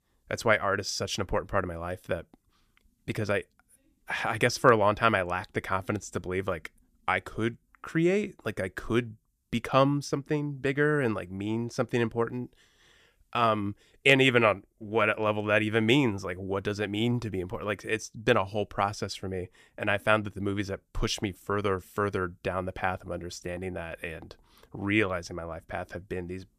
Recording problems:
none

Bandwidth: 14.5 kHz